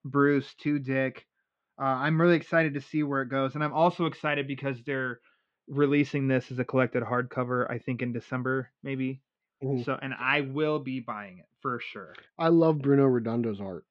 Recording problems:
muffled; slightly; fading above 3.5 kHz

